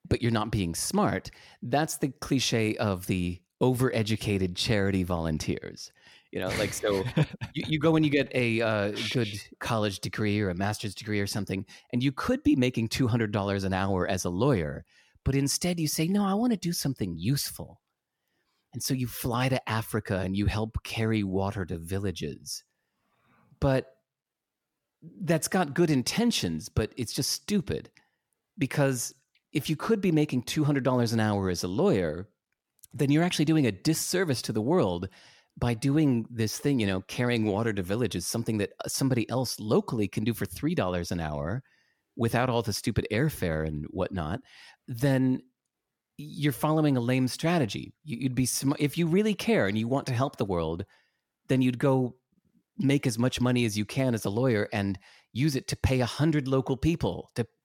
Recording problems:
none

